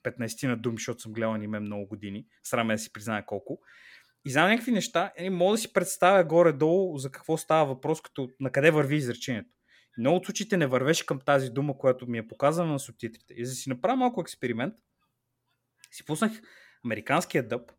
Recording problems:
none

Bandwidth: 17 kHz